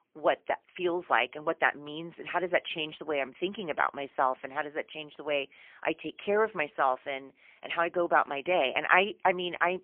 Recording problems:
phone-call audio; poor line; nothing above 3 kHz

